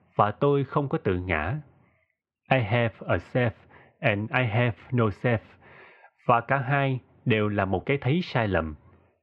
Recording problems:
muffled; slightly; fading above 3 kHz

